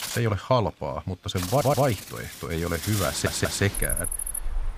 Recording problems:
animal sounds; loud; throughout; 6 dB below the speech
audio stuttering; at 1.5 s and at 3 s

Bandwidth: 15 kHz